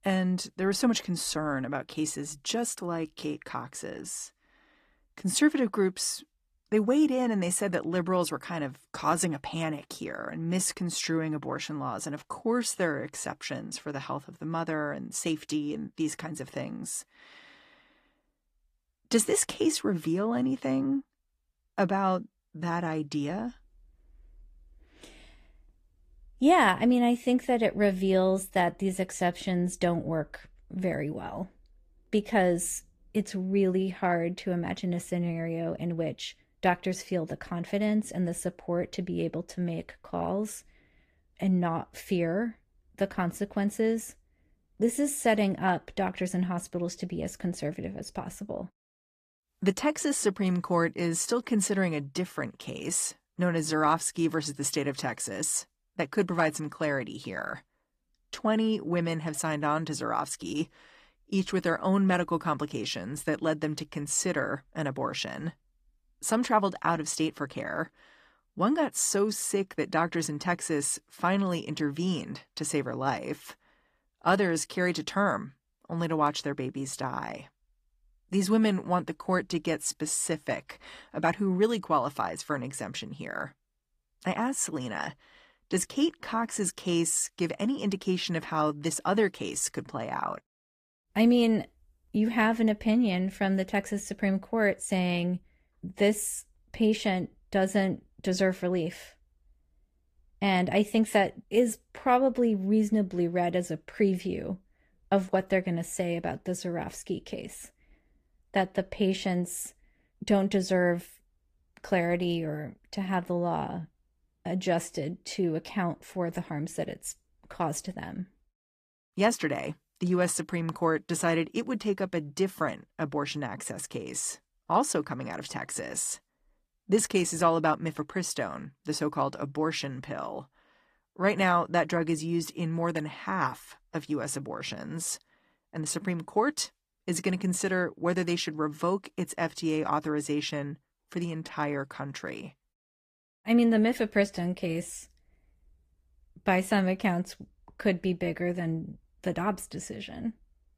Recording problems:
garbled, watery; slightly; nothing above 14.5 kHz

